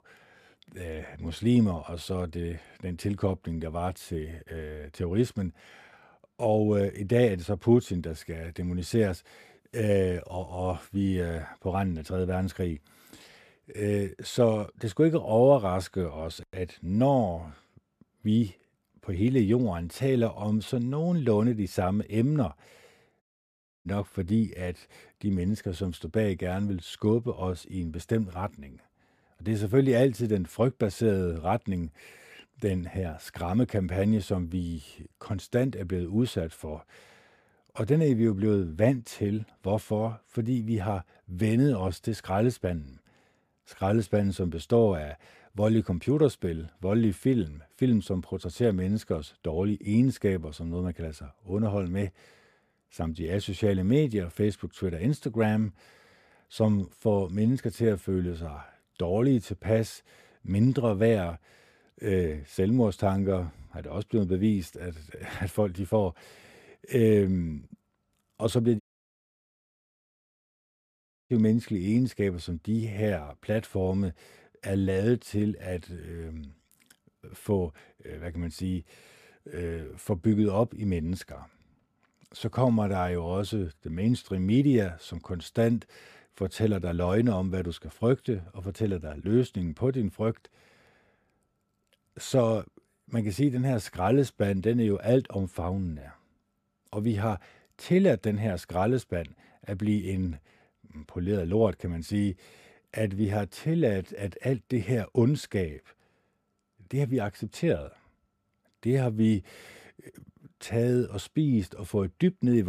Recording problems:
audio cutting out; at 23 s for 0.5 s and at 1:09 for 2.5 s
abrupt cut into speech; at the end

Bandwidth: 14.5 kHz